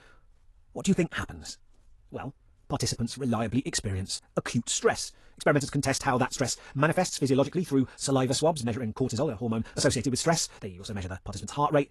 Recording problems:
wrong speed, natural pitch; too fast; 1.7 times normal speed
garbled, watery; slightly; nothing above 11 kHz

